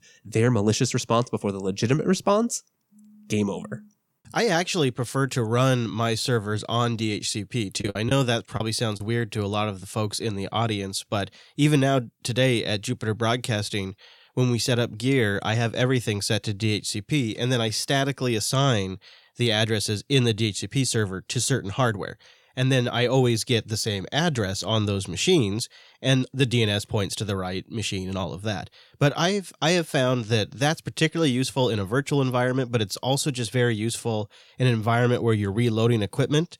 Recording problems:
choppy; very; from 7.5 to 9 s; 10% of the speech affected

